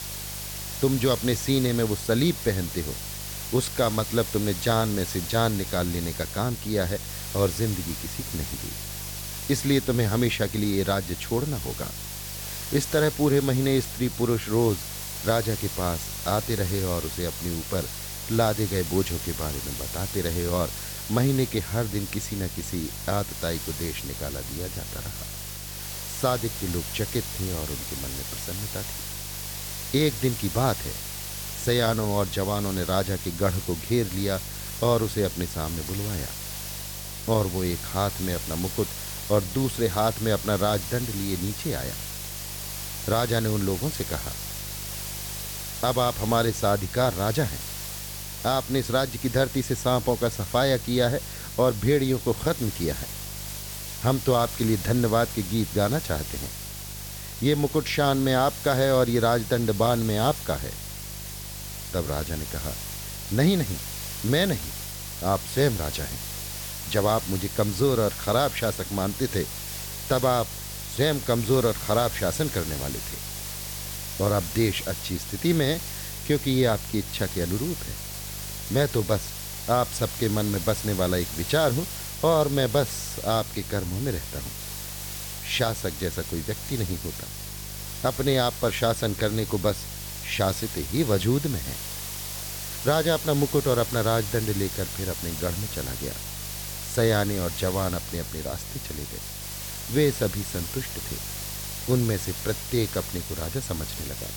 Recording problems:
hiss; loud; throughout; 7 dB below the speech
electrical hum; faint; throughout; 50 Hz, 25 dB below the speech

